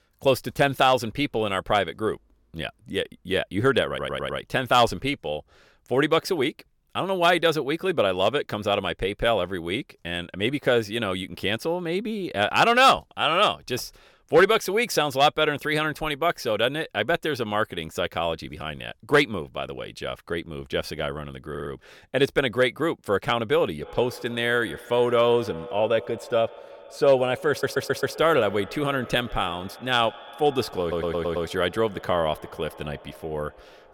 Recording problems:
echo of what is said; noticeable; from 24 s on; 140 ms later, 20 dB below the speech
audio stuttering; 4 times, first at 4 s

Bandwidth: 17.5 kHz